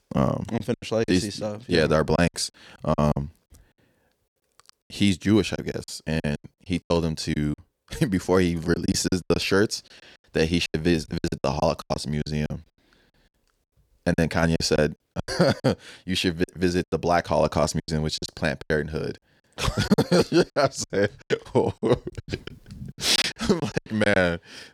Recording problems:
choppy; very; 13% of the speech affected

